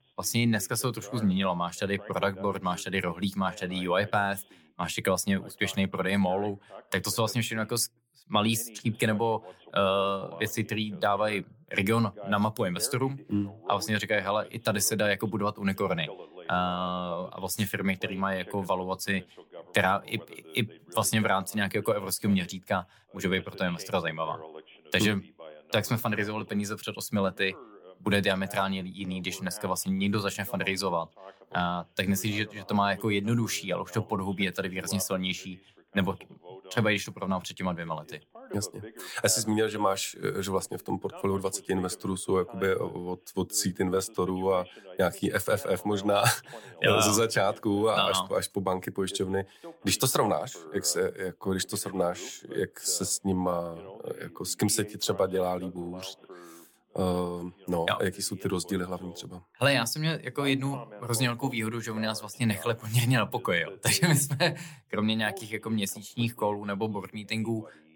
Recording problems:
voice in the background; noticeable; throughout; 20 dB below the speech

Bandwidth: 18 kHz